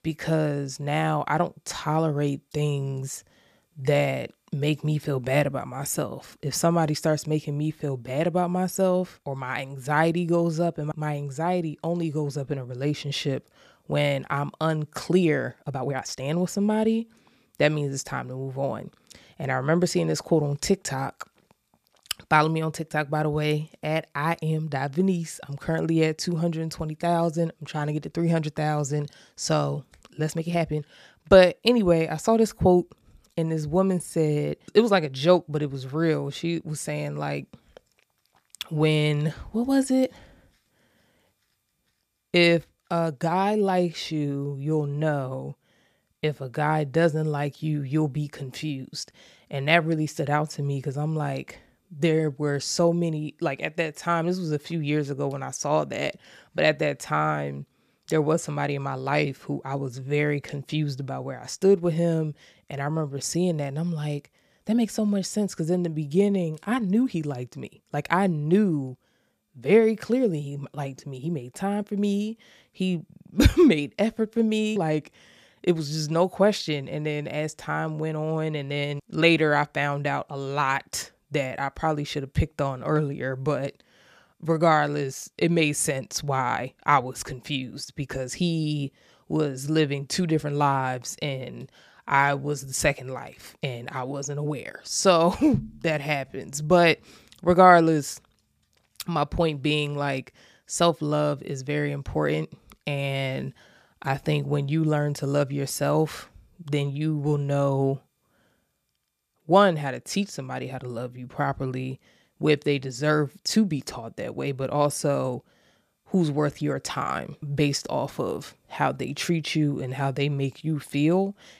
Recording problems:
uneven, jittery; strongly; from 16 s to 1:36

